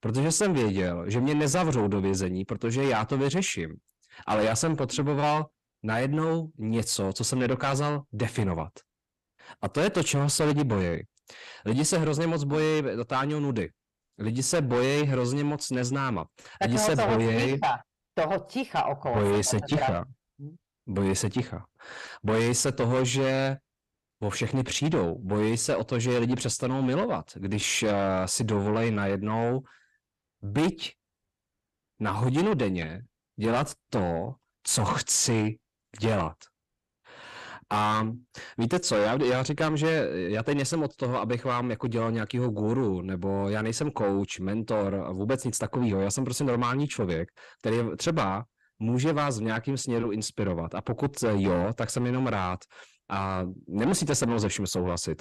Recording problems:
distortion; heavy; 7 dB below the speech

